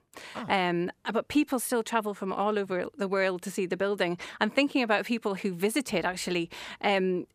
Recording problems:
none

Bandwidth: 15 kHz